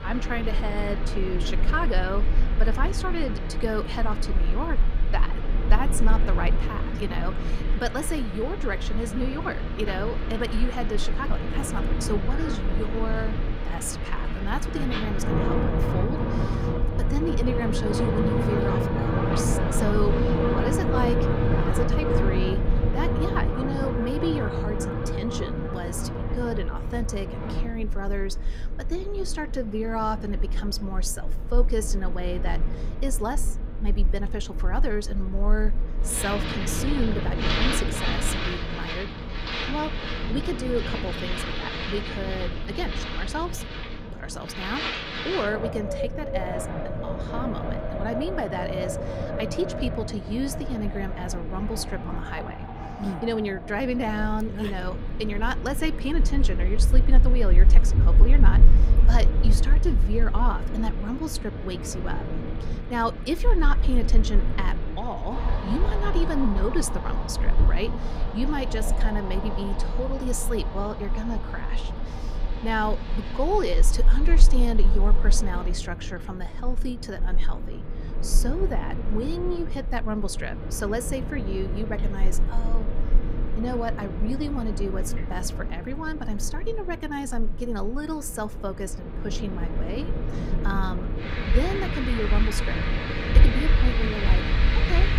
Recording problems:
wind in the background; very loud; throughout; 3 dB above the speech

